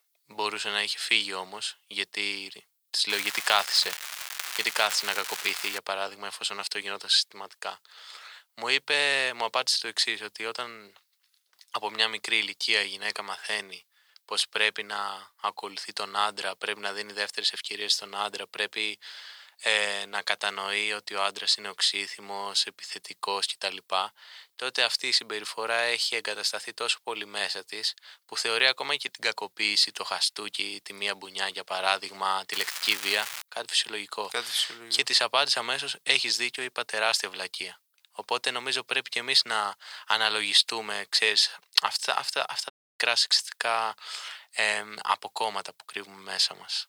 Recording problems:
thin; very; fading below 850 Hz
crackling; loud; from 3 to 6 s and at 33 s; 8 dB below the speech
audio cutting out; at 43 s

